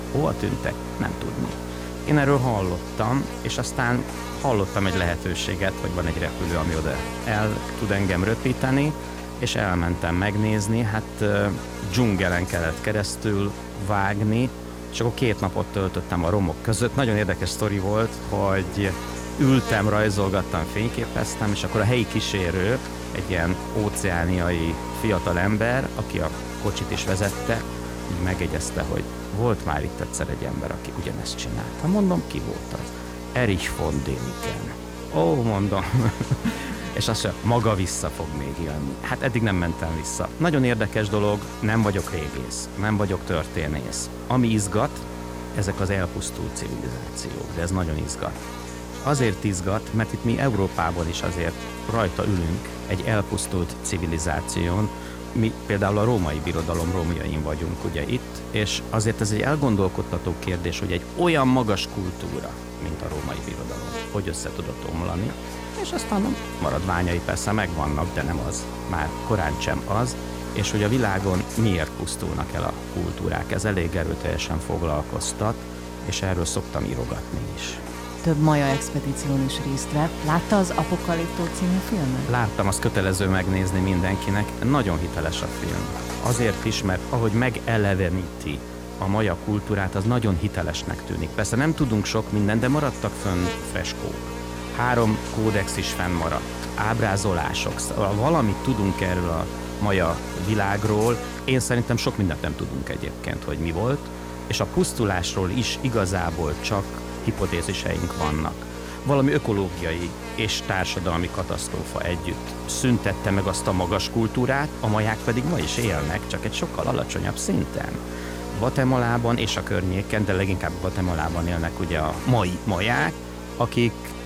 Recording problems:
electrical hum; loud; throughout; 60 Hz, 8 dB below the speech

